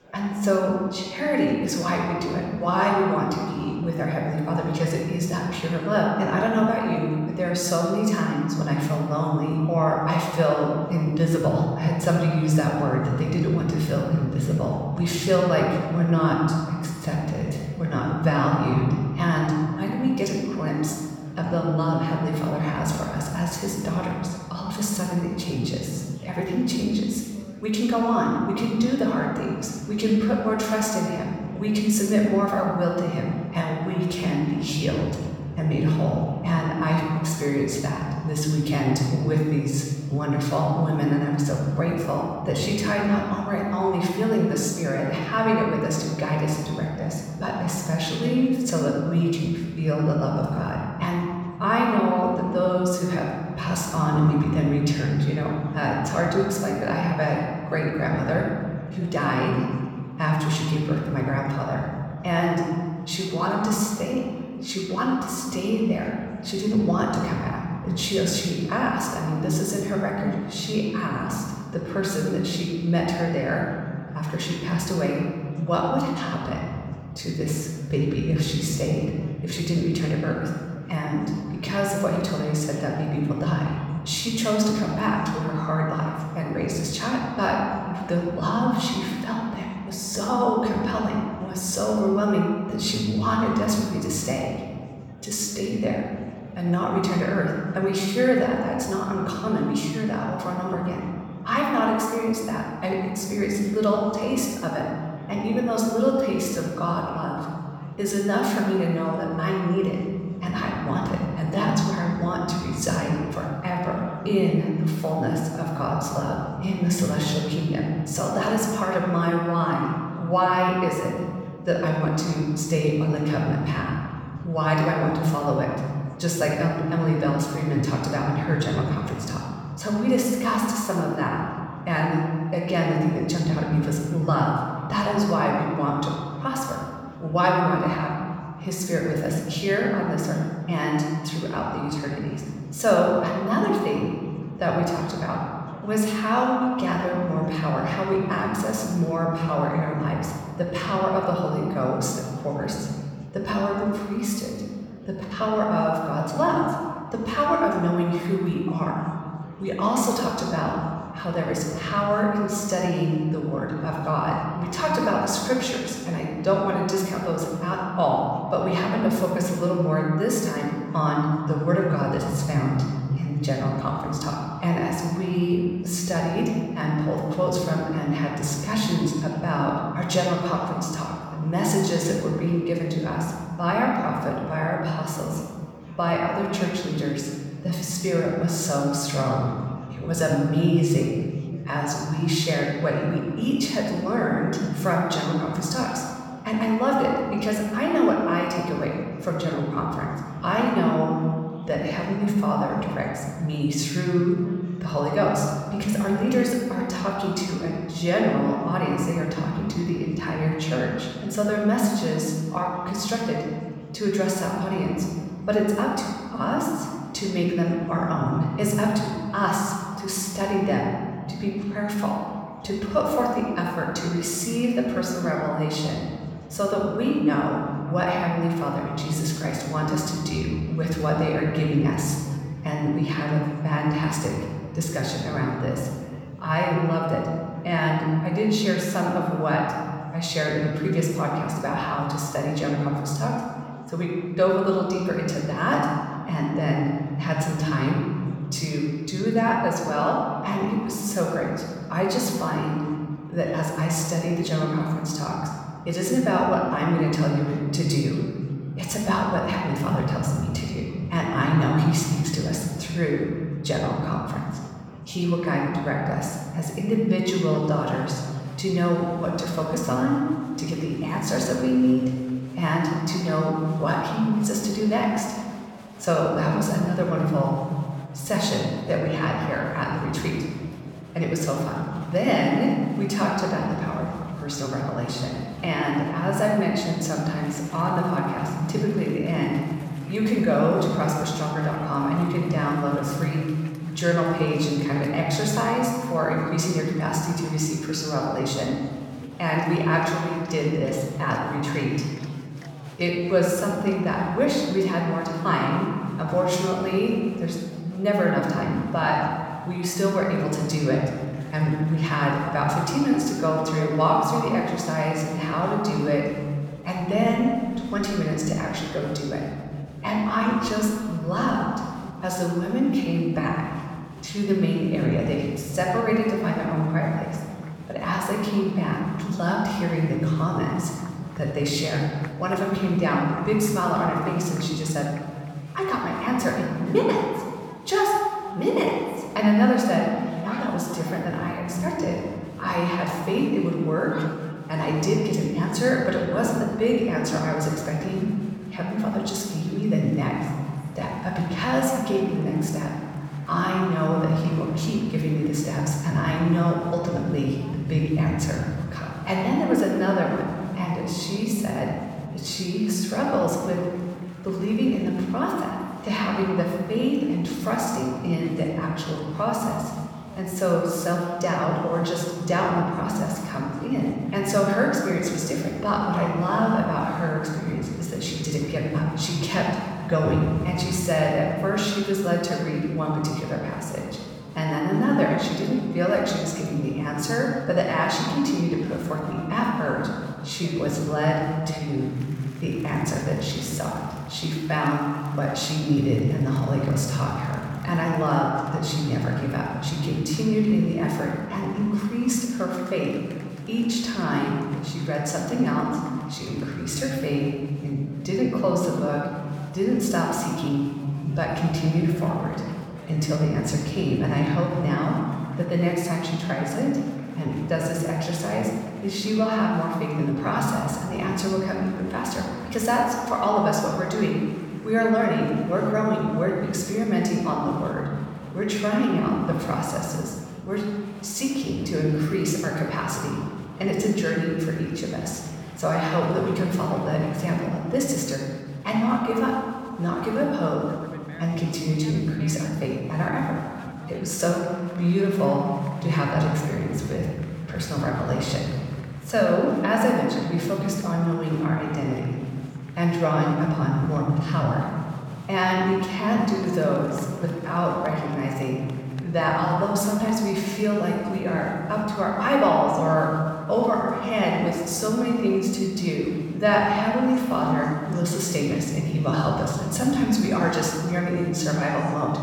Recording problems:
room echo; noticeable; dies away in 2.1 s
off-mic speech; somewhat distant
murmuring crowd; faint; throughout; 25 dB below the speech

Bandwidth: 18.5 kHz